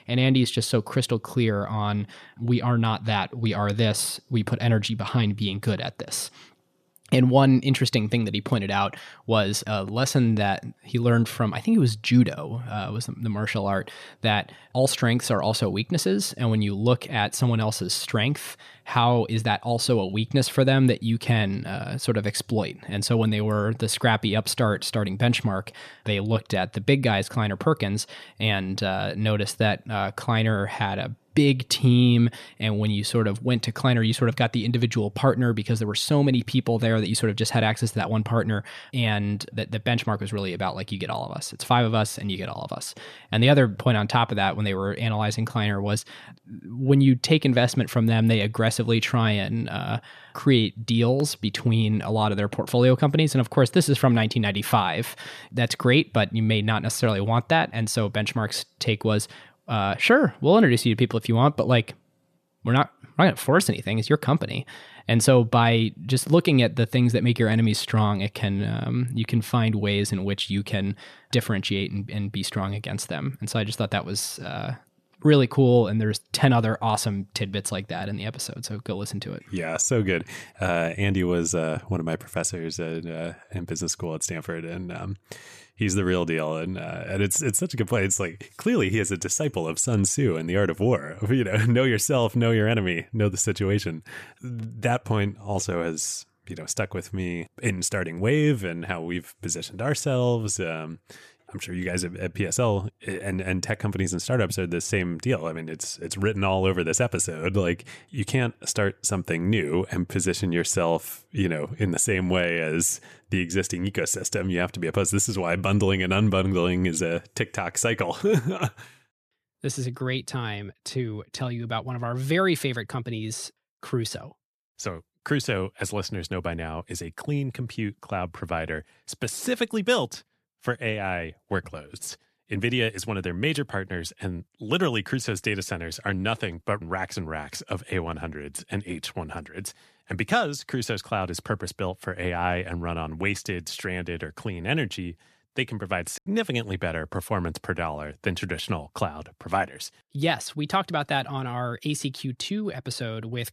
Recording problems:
choppy; occasionally; at 2:26; 2% of the speech affected

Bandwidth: 14.5 kHz